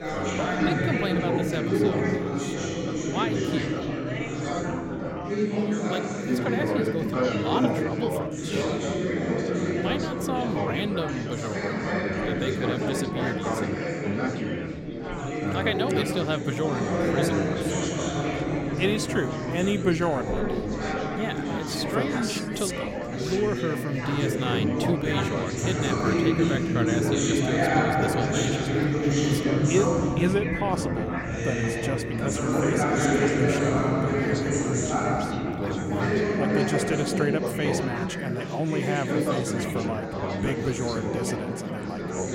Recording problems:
chatter from many people; very loud; throughout; 4 dB above the speech

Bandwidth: 16.5 kHz